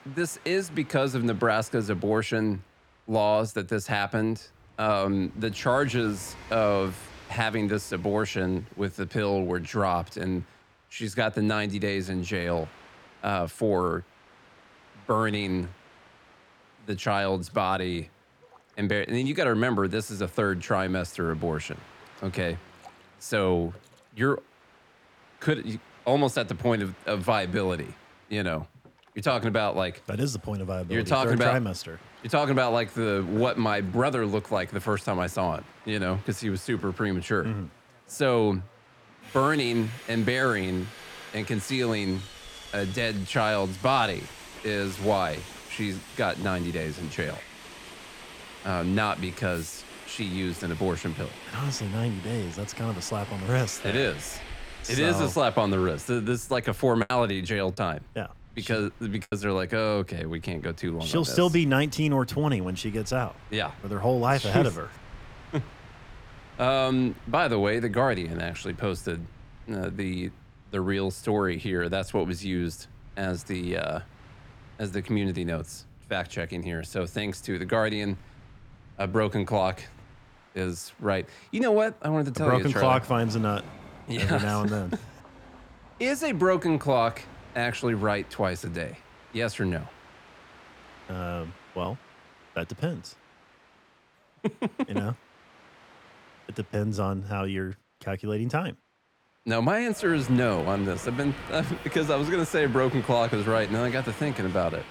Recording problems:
train or aircraft noise; noticeable; throughout; 20 dB below the speech
choppy; occasionally; from 57 to 59 s; 4% of the speech affected

